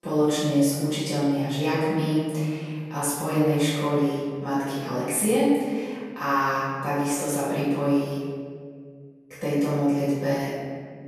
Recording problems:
room echo; strong; dies away in 1.8 s
off-mic speech; far

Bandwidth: 13.5 kHz